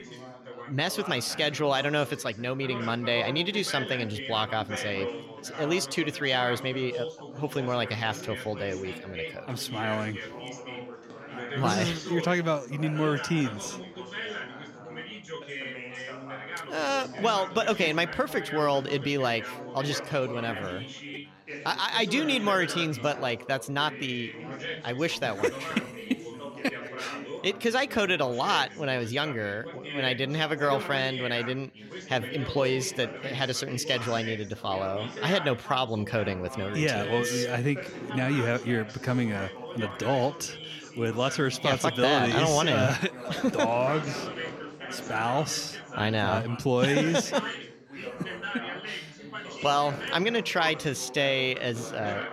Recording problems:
background chatter; loud; throughout; 4 voices, 10 dB below the speech

